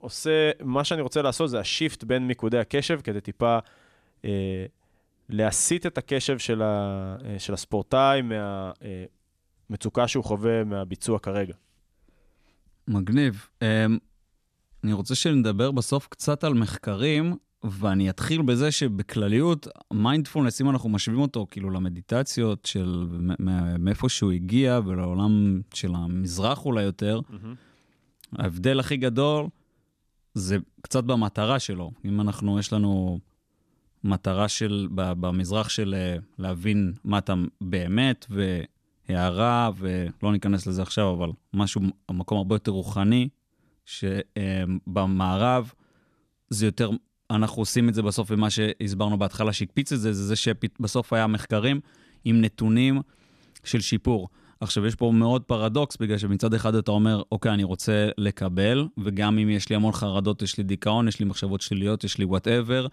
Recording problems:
none

